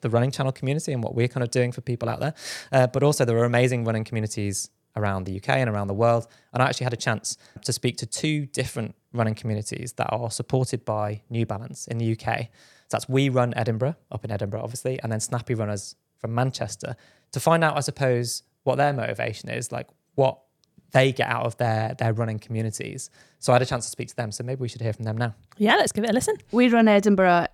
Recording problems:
none

